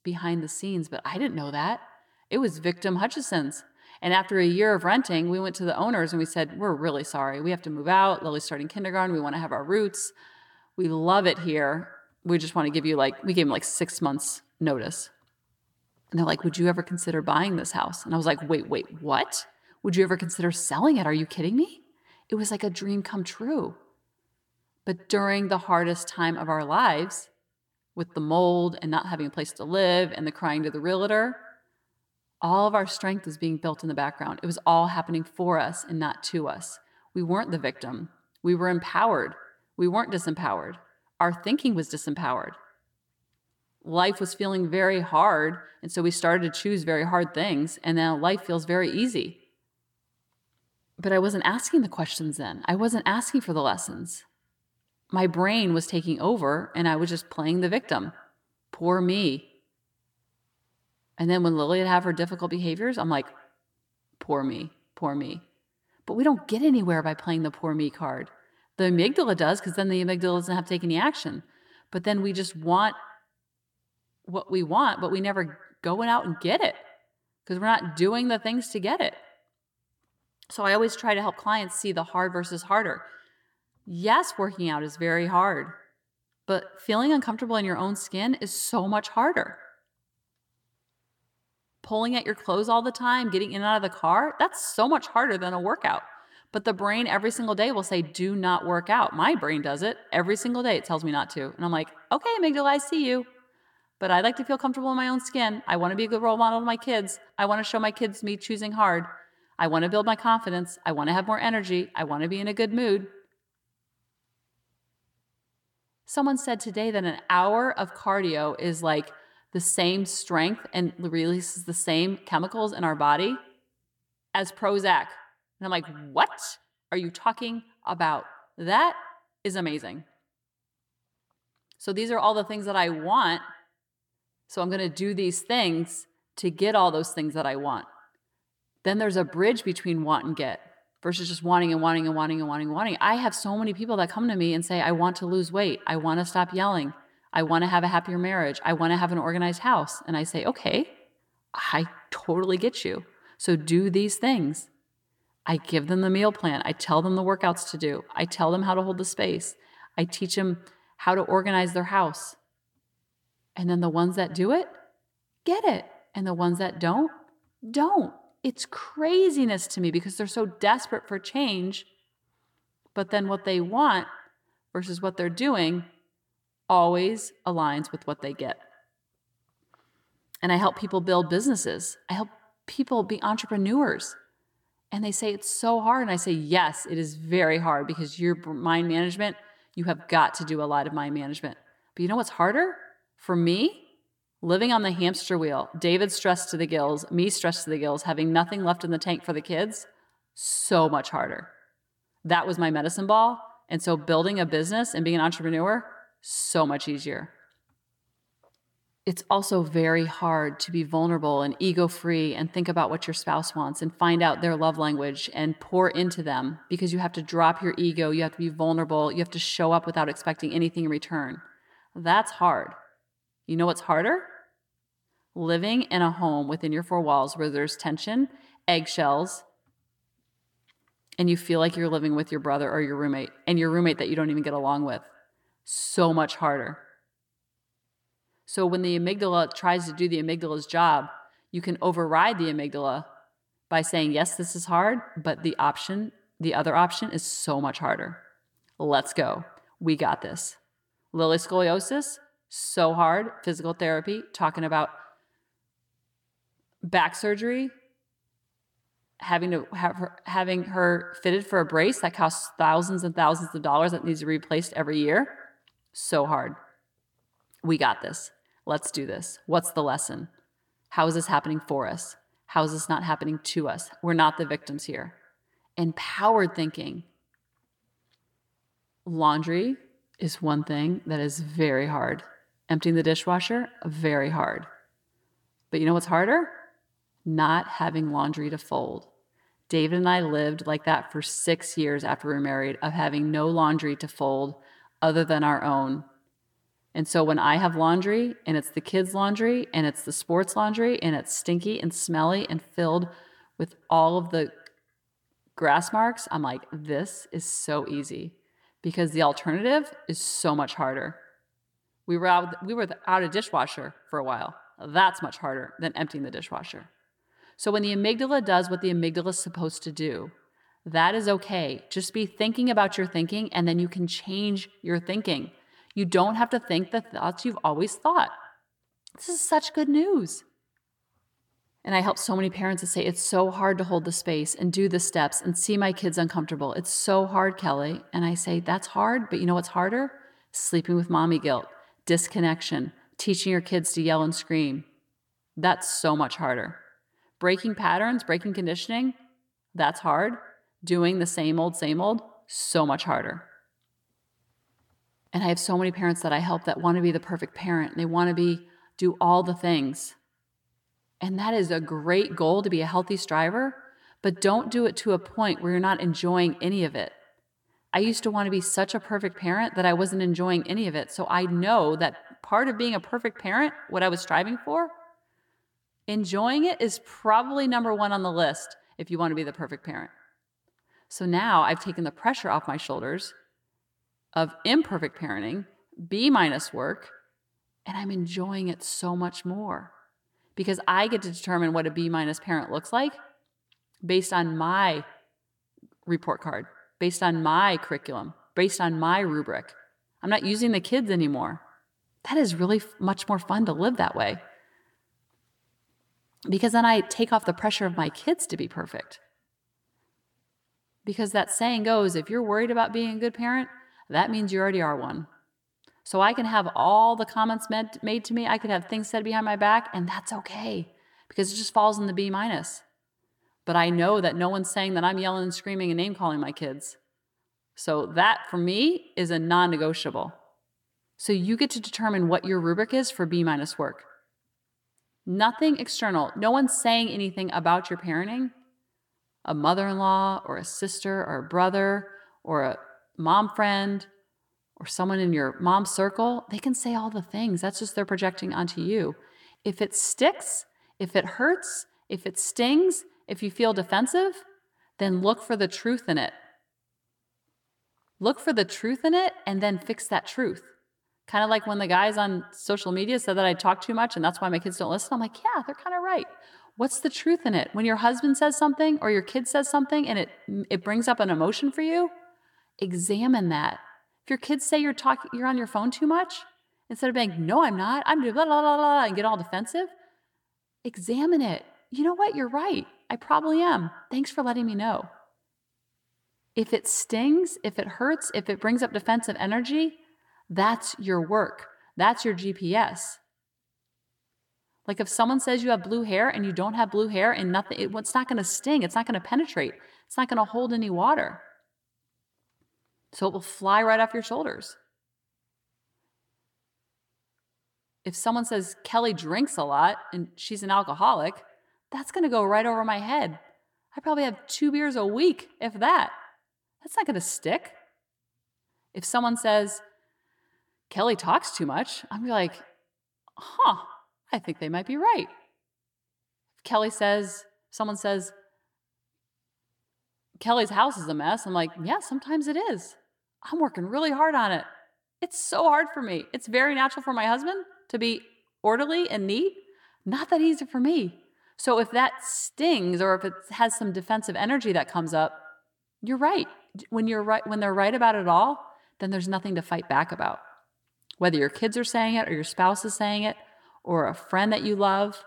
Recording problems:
echo of what is said; faint; throughout; 110 ms later, 20 dB below the speech

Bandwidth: 18 kHz